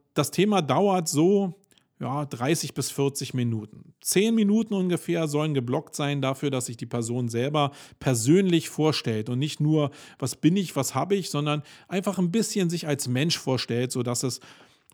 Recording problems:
none

